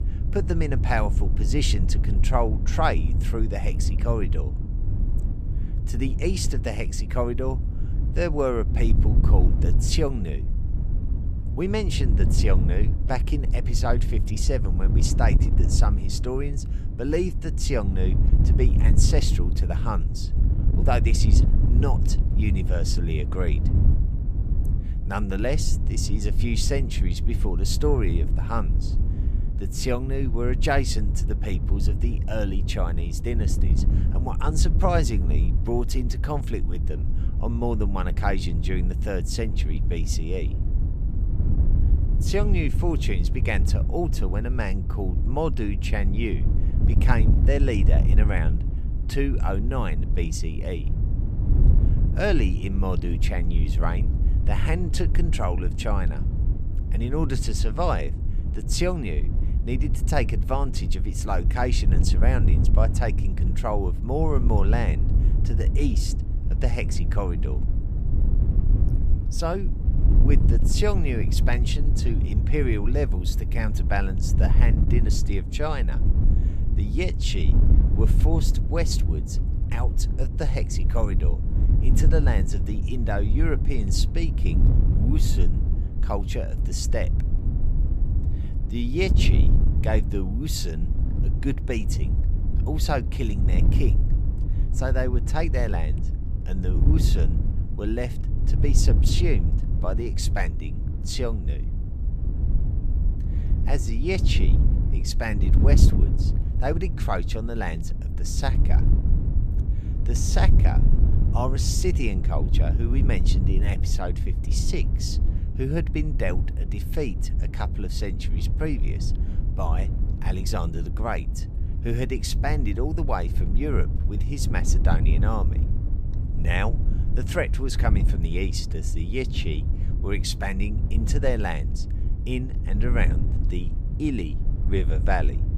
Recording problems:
wind noise on the microphone; heavy; 9 dB below the speech

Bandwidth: 14.5 kHz